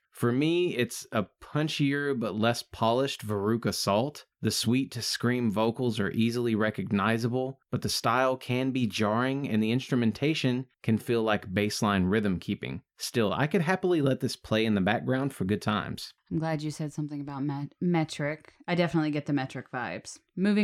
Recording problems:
abrupt cut into speech; at the end

